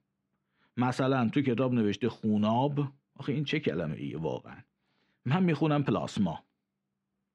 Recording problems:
muffled; slightly; fading above 2.5 kHz

